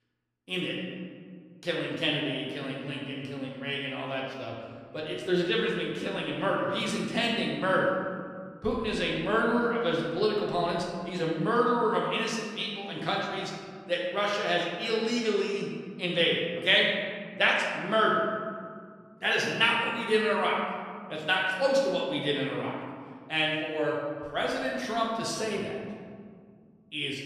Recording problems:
off-mic speech; far
room echo; noticeable; dies away in 1.8 s

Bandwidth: 14.5 kHz